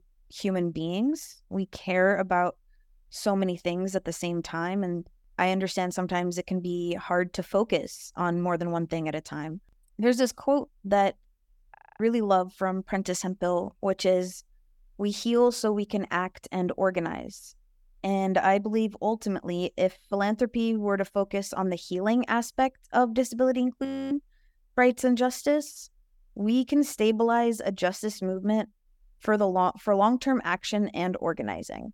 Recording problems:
audio freezing; at 12 s and at 24 s

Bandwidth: 18.5 kHz